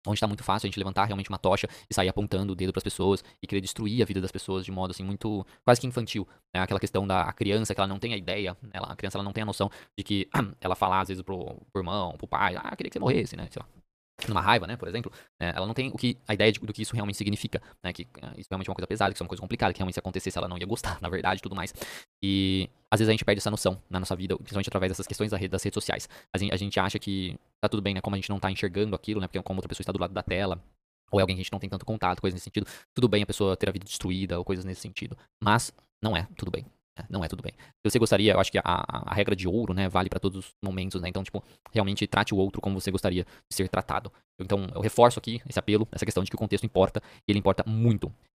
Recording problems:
wrong speed, natural pitch; too fast; 1.7 times normal speed

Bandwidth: 15 kHz